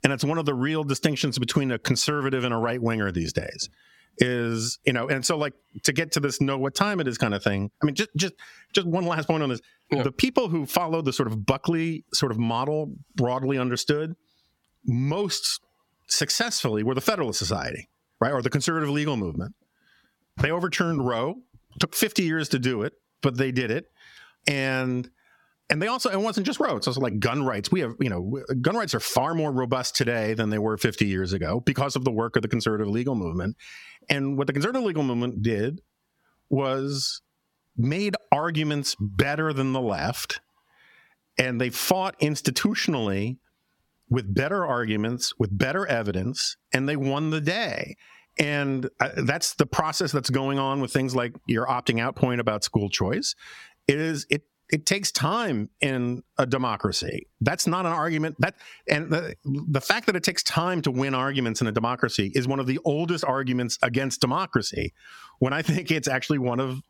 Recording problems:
squashed, flat; somewhat

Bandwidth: 17 kHz